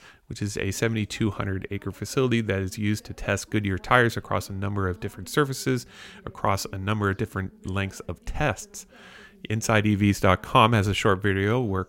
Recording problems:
voice in the background; faint; throughout; 30 dB below the speech

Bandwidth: 16 kHz